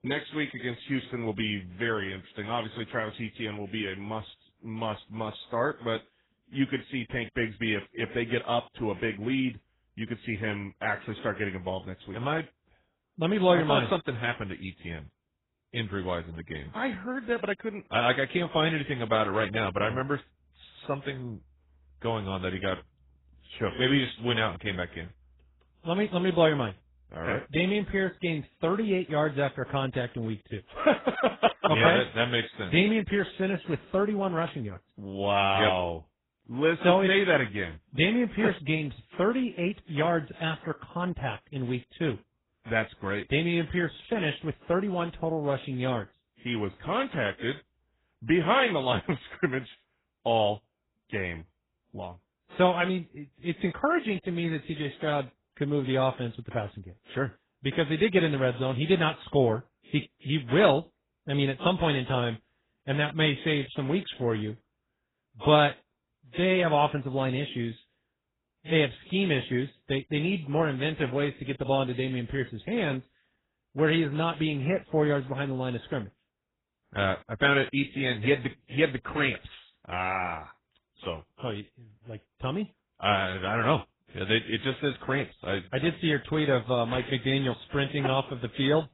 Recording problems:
garbled, watery; badly; nothing above 4 kHz

